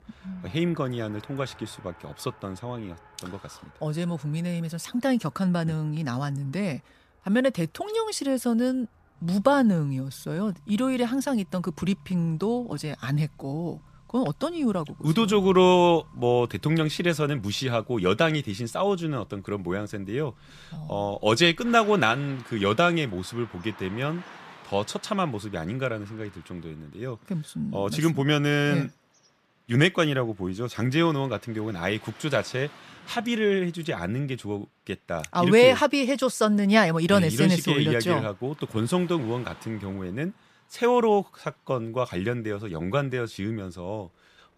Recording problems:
traffic noise; faint; throughout; 25 dB below the speech

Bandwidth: 14.5 kHz